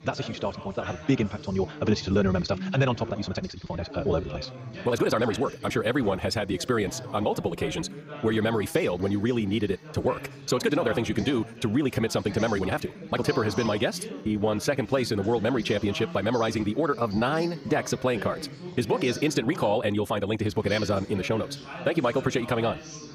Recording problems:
wrong speed, natural pitch; too fast; 1.7 times normal speed
background chatter; noticeable; throughout; 3 voices, 15 dB below the speech
uneven, jittery; strongly; from 3 to 17 s

